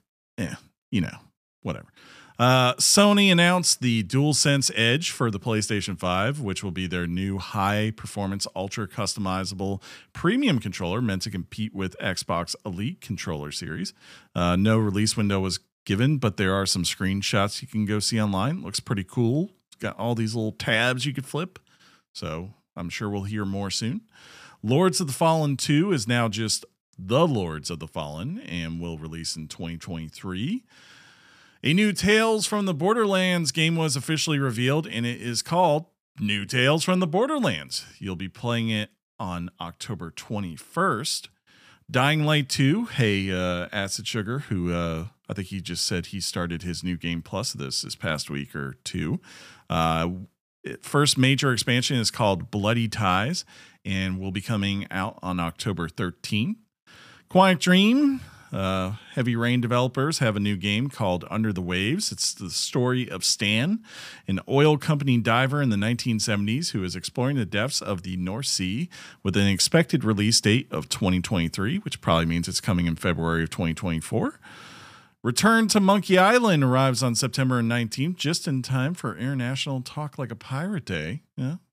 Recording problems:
none

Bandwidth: 15 kHz